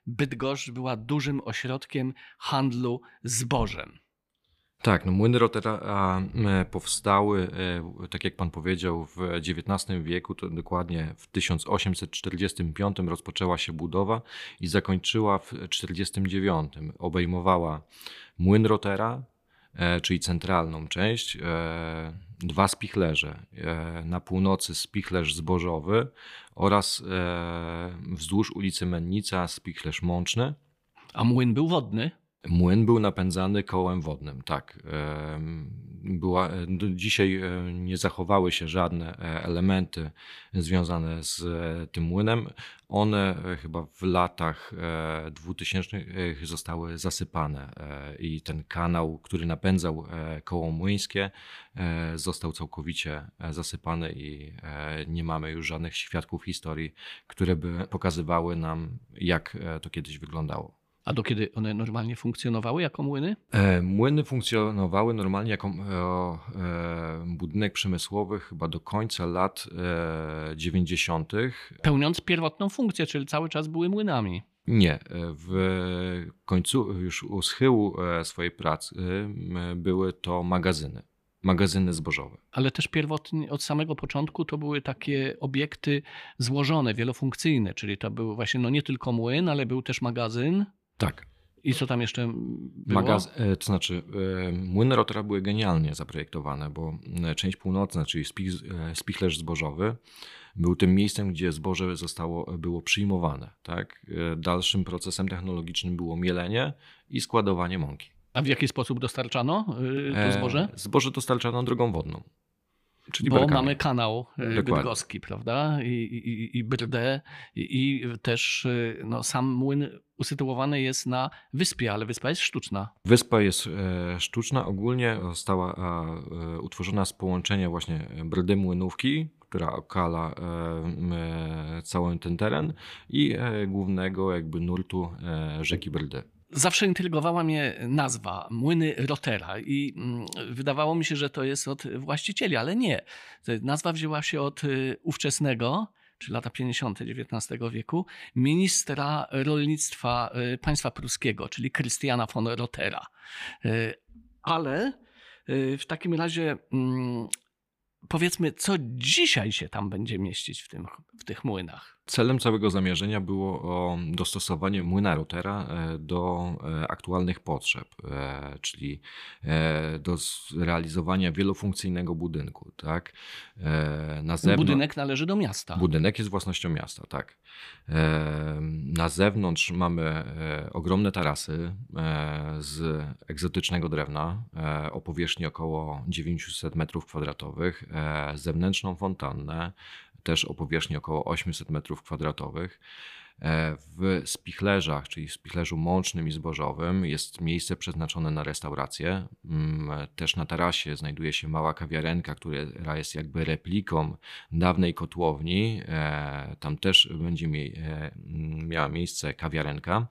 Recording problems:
none

